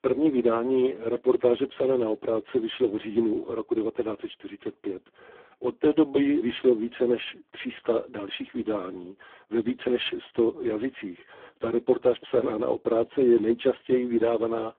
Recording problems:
phone-call audio; poor line; nothing above 3 kHz

